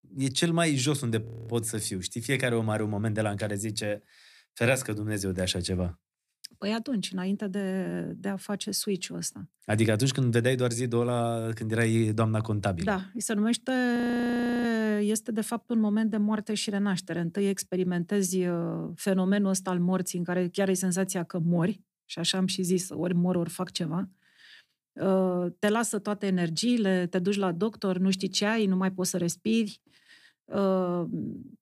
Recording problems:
audio freezing; at 1.5 s and at 14 s for 0.5 s

